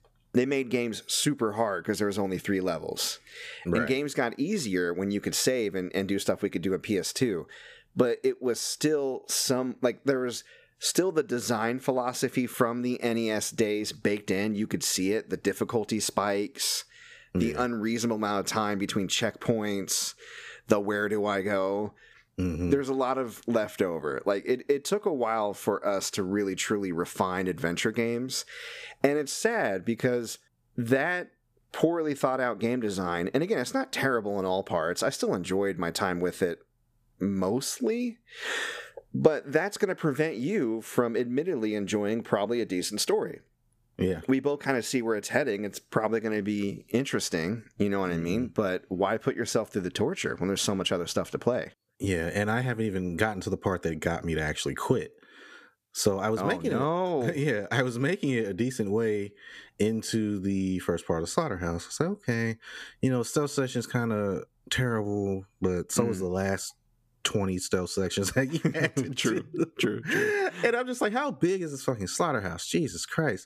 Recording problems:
squashed, flat; somewhat

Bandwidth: 14.5 kHz